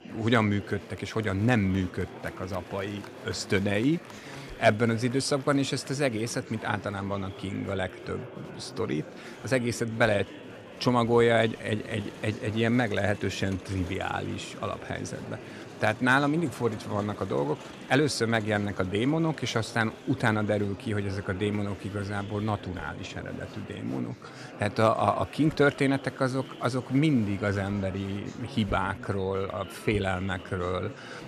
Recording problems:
murmuring crowd; noticeable; throughout; 15 dB below the speech

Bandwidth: 15 kHz